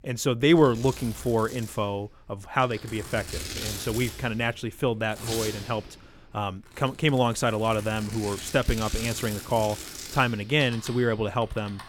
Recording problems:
household noises; noticeable; throughout; 10 dB below the speech

